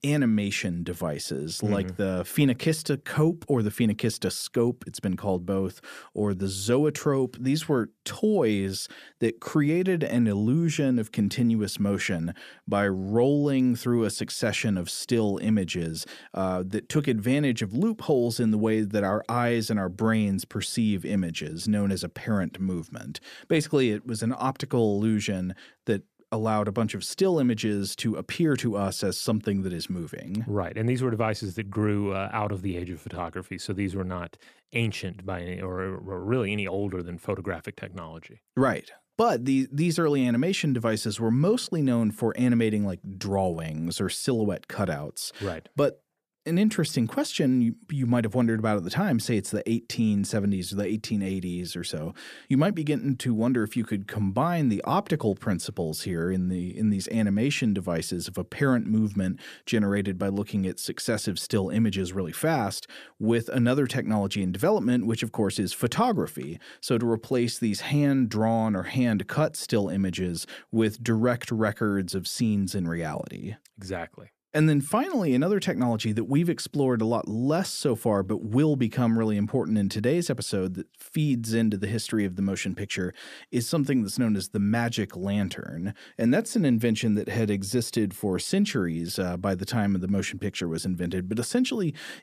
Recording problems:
none

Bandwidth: 14.5 kHz